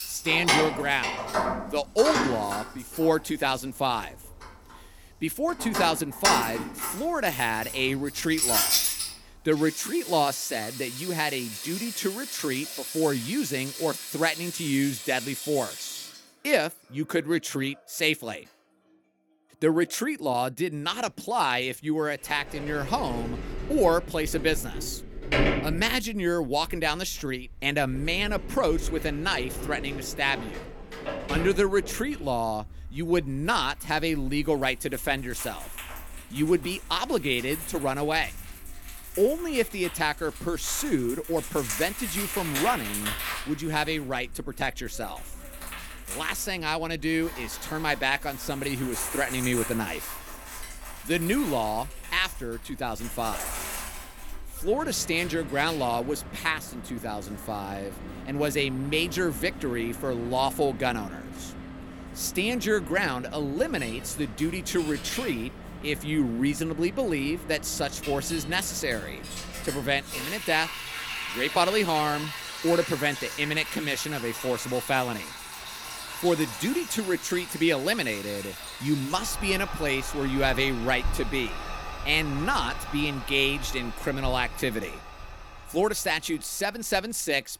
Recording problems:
household noises; loud; throughout; 6 dB below the speech

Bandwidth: 17 kHz